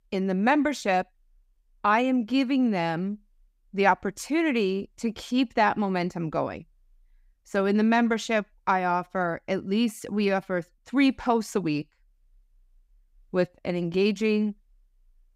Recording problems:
none

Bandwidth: 15.5 kHz